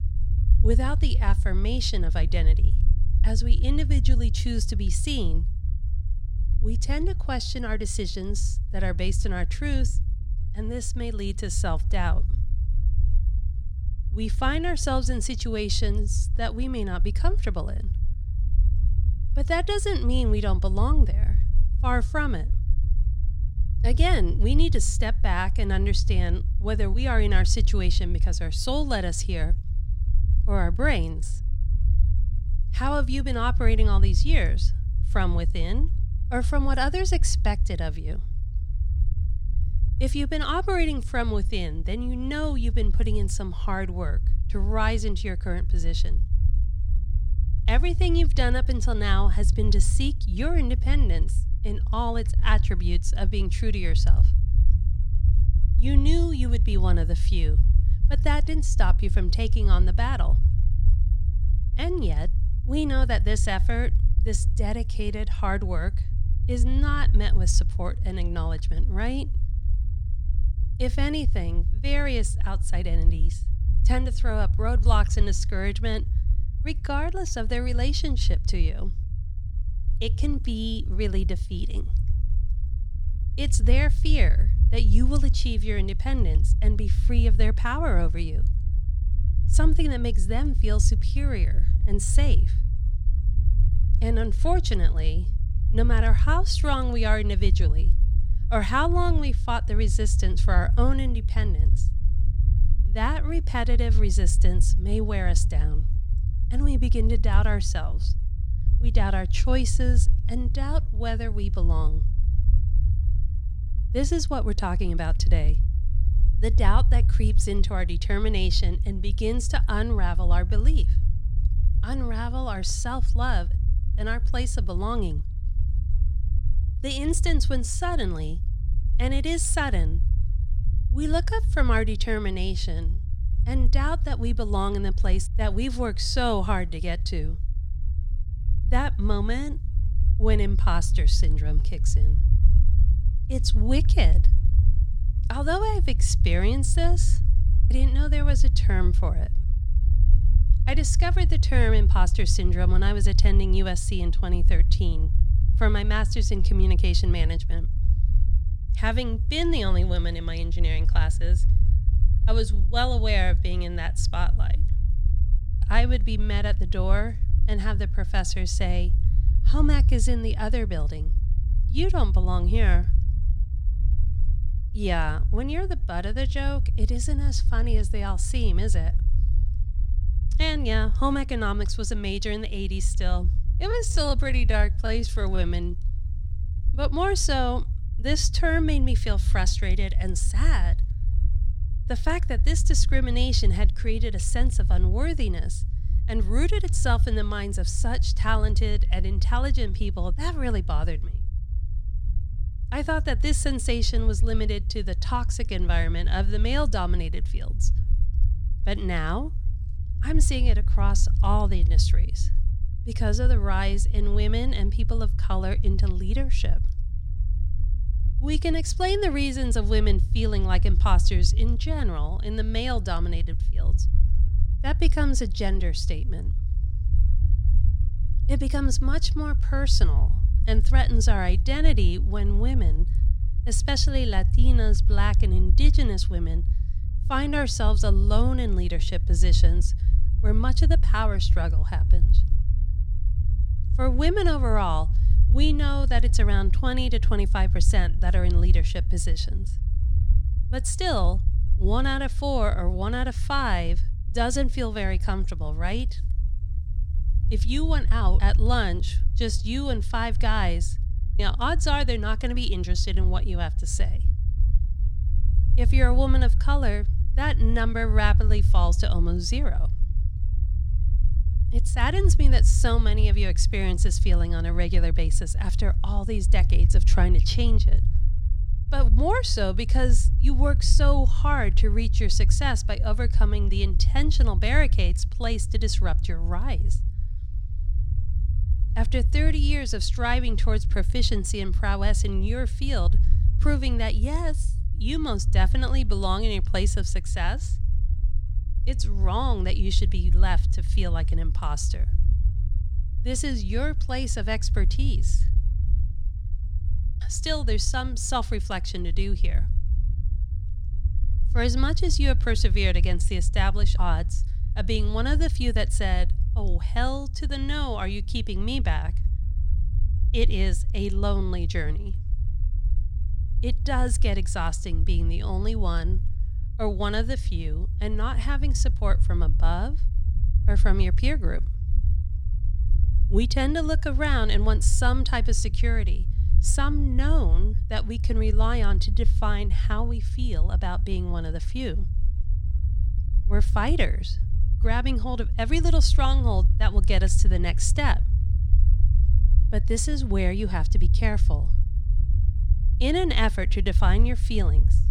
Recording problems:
low rumble; noticeable; throughout; 15 dB below the speech

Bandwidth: 18 kHz